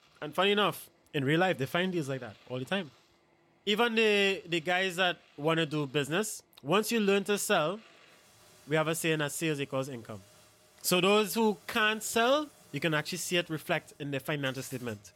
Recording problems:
household noises; faint; throughout; 30 dB below the speech

